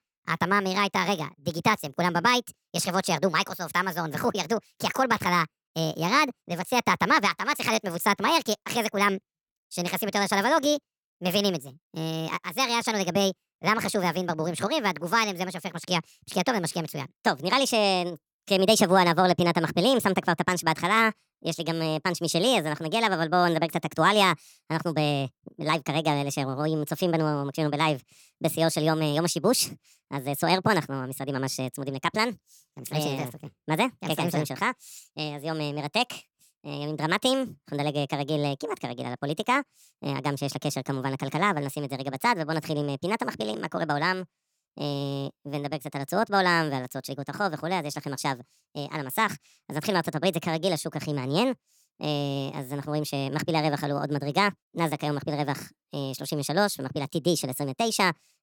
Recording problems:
wrong speed and pitch; too fast and too high; 1.5 times normal speed

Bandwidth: 18.5 kHz